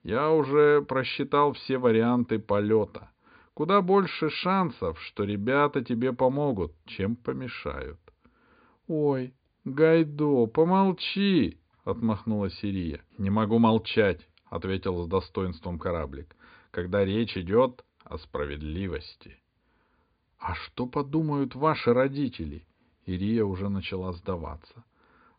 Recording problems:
high frequencies cut off; severe; nothing above 5 kHz

